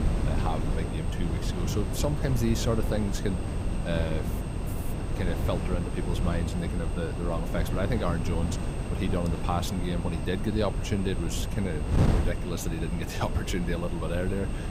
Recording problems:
wind noise on the microphone; heavy; 4 dB below the speech
electrical hum; noticeable; throughout; 50 Hz, 20 dB below the speech
high-pitched whine; faint; throughout; 8.5 kHz, 20 dB below the speech

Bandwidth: 15.5 kHz